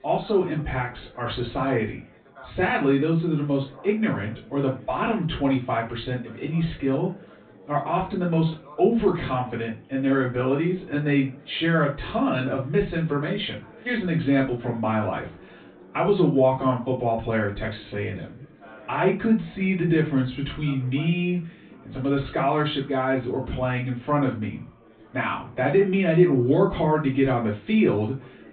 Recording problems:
off-mic speech; far
high frequencies cut off; severe; nothing above 4 kHz
room echo; slight; dies away in 0.3 s
chatter from many people; faint; throughout; 25 dB below the speech

